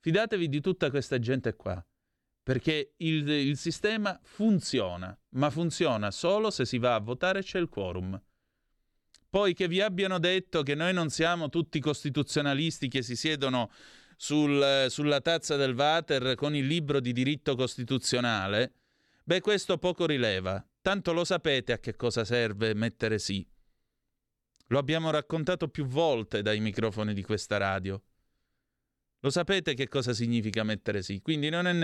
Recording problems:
abrupt cut into speech; at the end

